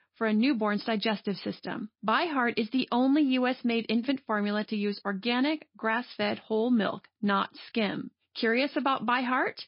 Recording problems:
garbled, watery; slightly; nothing above 5 kHz
high frequencies cut off; slight

